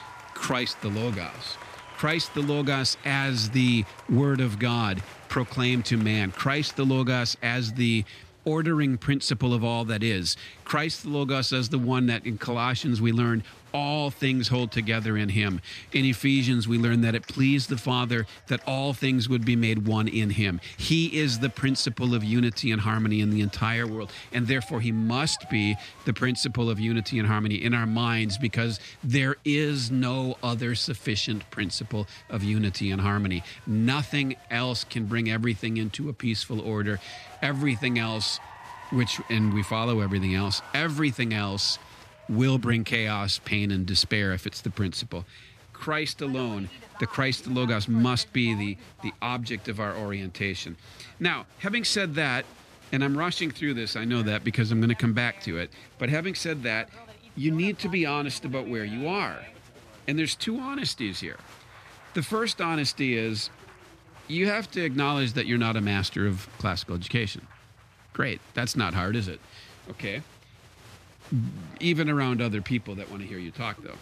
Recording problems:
crowd noise; faint; throughout; 20 dB below the speech

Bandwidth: 14.5 kHz